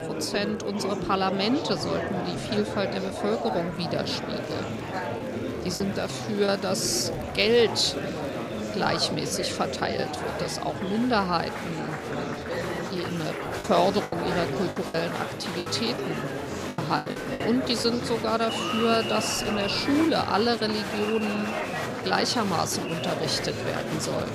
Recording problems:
murmuring crowd; loud; throughout; 4 dB below the speech
choppy; very; at 6 s and from 14 to 18 s; 8% of the speech affected

